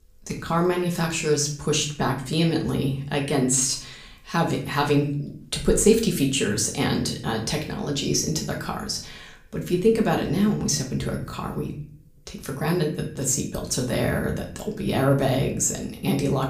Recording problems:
room echo; slight; dies away in 0.5 s
off-mic speech; somewhat distant

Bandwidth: 15 kHz